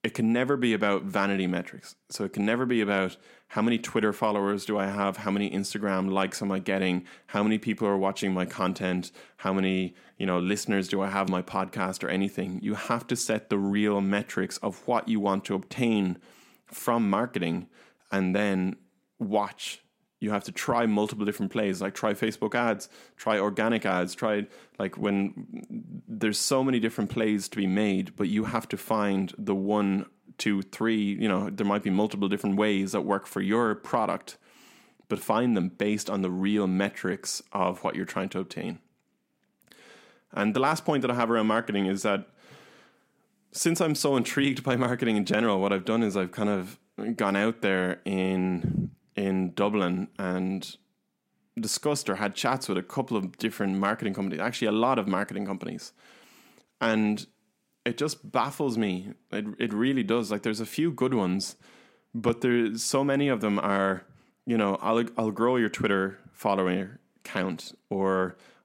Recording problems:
none

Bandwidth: 16 kHz